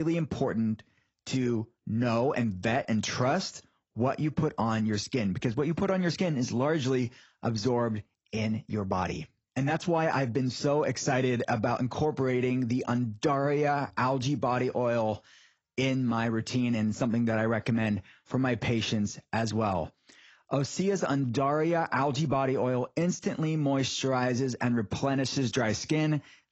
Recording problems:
garbled, watery; badly; nothing above 7 kHz
abrupt cut into speech; at the start

